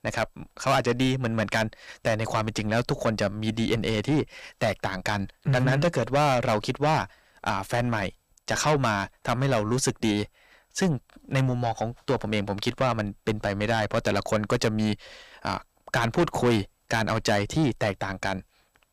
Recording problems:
distortion; heavy; 6 dB below the speech

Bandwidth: 15 kHz